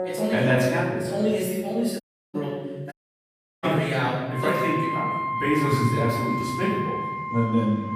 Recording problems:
room echo; strong; dies away in 1.1 s
off-mic speech; far
background music; loud; throughout; 5 dB below the speech
audio cutting out; at 2 s and at 3 s for 0.5 s

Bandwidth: 15 kHz